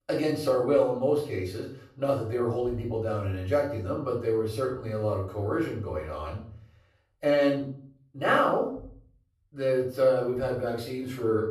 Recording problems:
off-mic speech; far
room echo; noticeable; dies away in 0.5 s

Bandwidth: 13.5 kHz